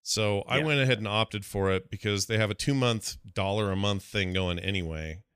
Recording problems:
none

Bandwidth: 14.5 kHz